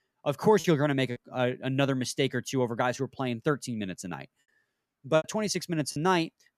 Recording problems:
choppy; very; at 0.5 s and at 5 s; 5% of the speech affected

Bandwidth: 14.5 kHz